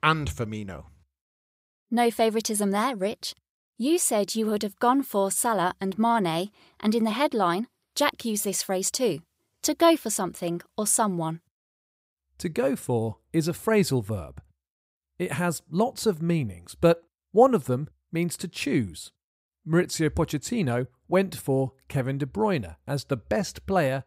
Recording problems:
none

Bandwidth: 15.5 kHz